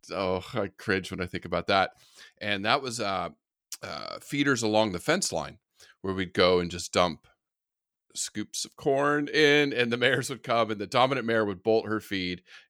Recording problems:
none

